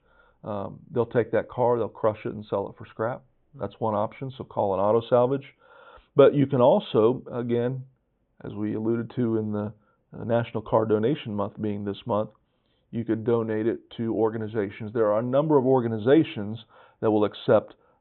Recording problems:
high frequencies cut off; severe; nothing above 3.5 kHz

